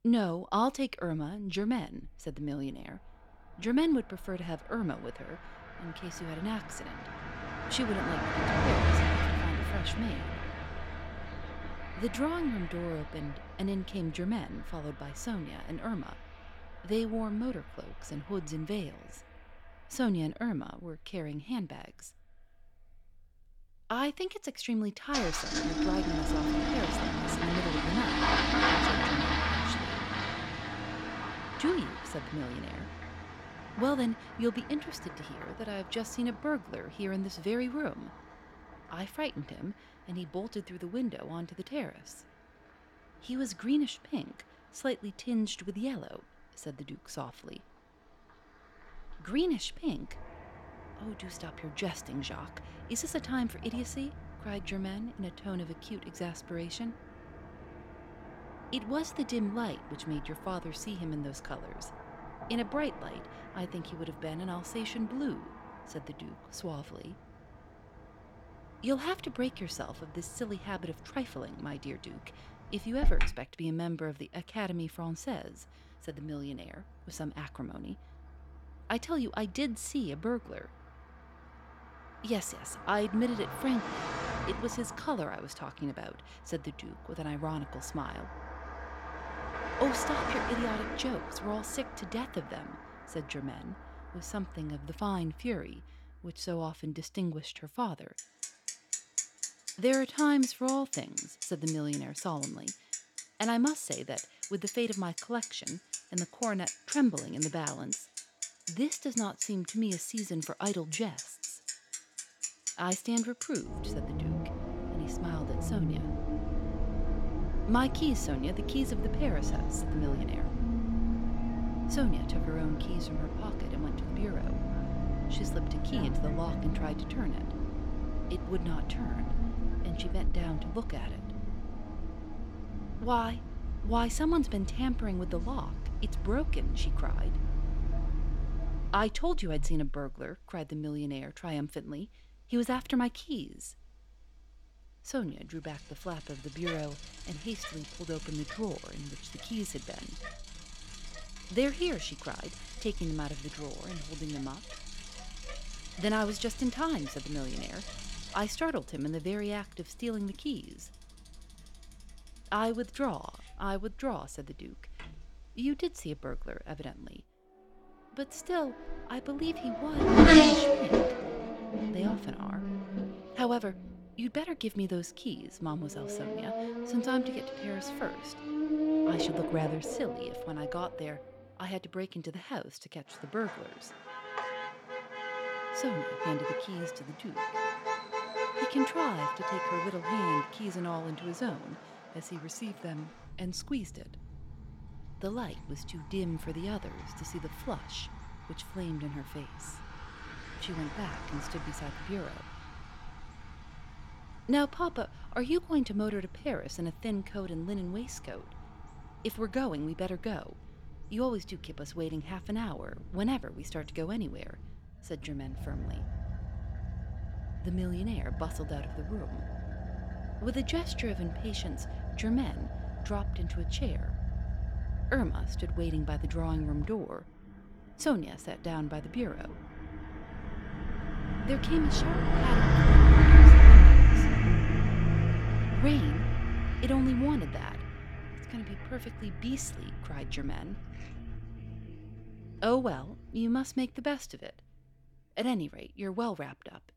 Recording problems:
traffic noise; very loud; throughout; 5 dB above the speech

